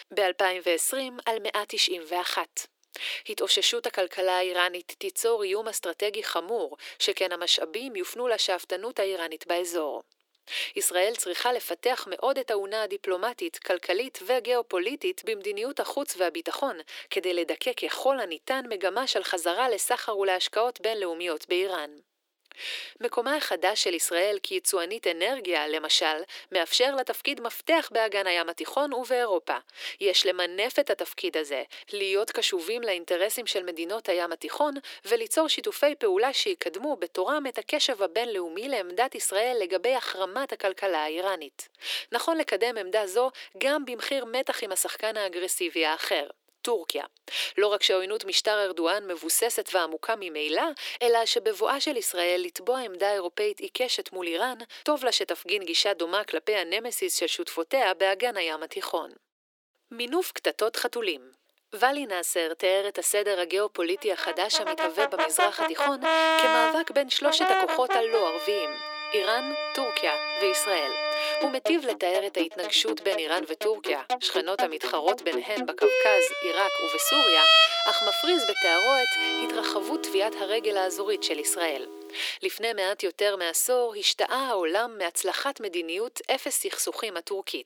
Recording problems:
thin; very; fading below 300 Hz
background music; very loud; from 1:05 on; 2 dB above the speech

